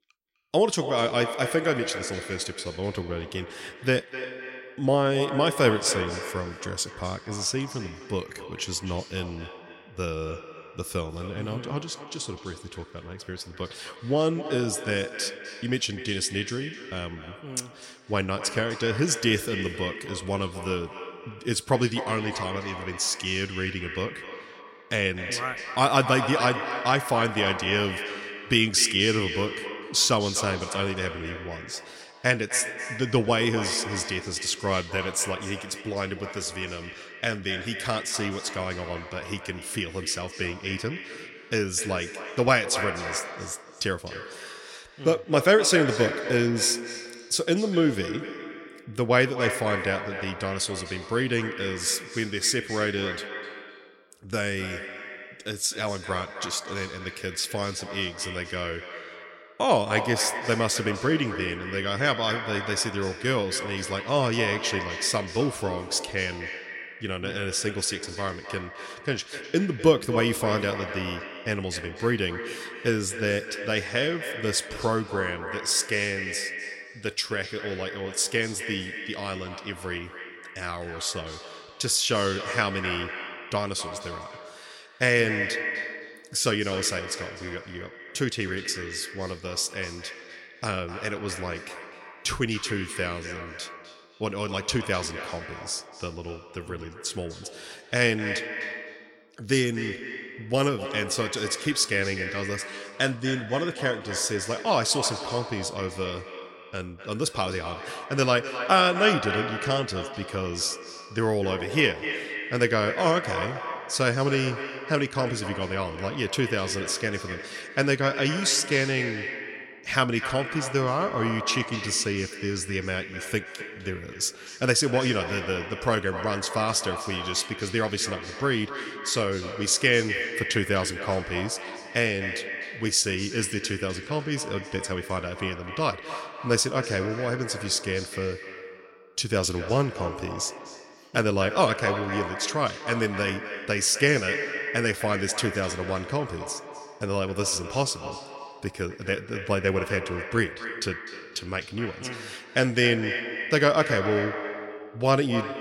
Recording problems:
echo of what is said; strong; throughout; 250 ms later, 8 dB below the speech

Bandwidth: 16 kHz